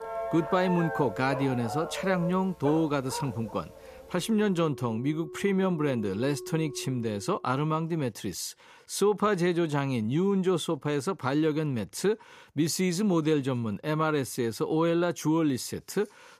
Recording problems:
background music; noticeable; until 7 s; 15 dB below the speech
dog barking; noticeable; until 4 s; peak 7 dB below the speech

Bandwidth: 14.5 kHz